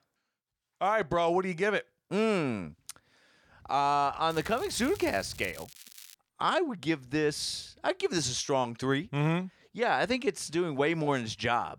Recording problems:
crackling; noticeable; from 4.5 to 6 s; 20 dB below the speech

